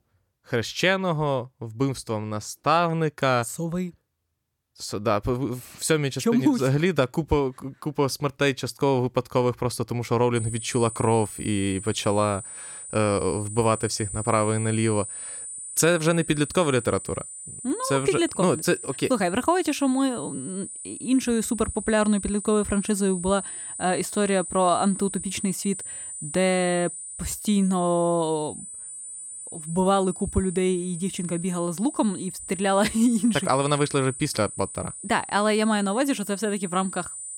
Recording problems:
high-pitched whine; loud; from 10 s on; 9 kHz, 10 dB below the speech

